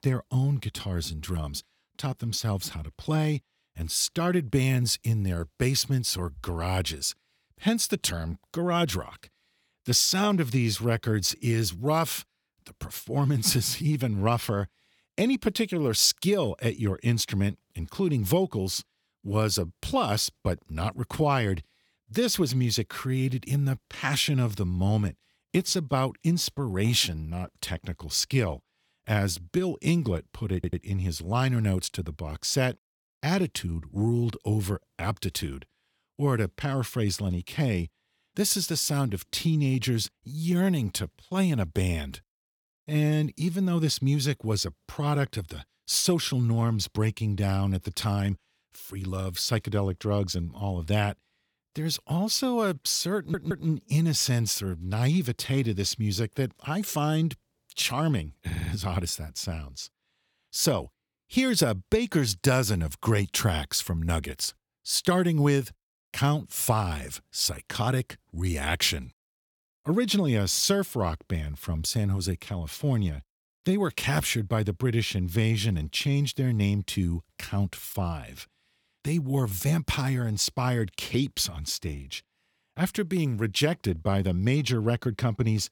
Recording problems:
audio stuttering; at 31 s, at 53 s and at 58 s

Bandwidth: 18 kHz